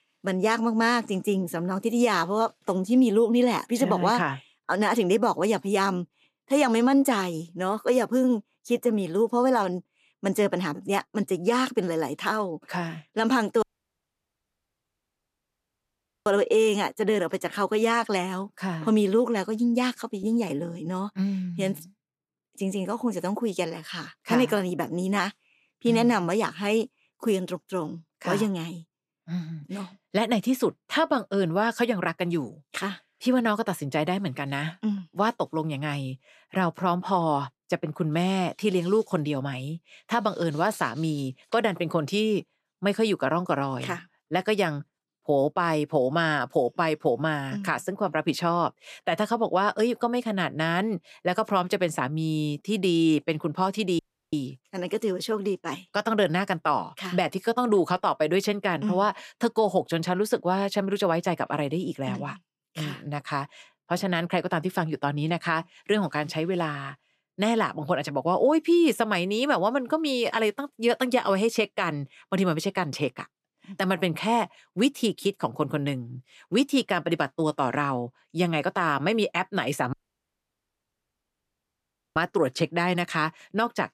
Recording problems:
audio cutting out; at 14 s for 2.5 s, at 54 s and at 1:20 for 2 s

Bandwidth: 14 kHz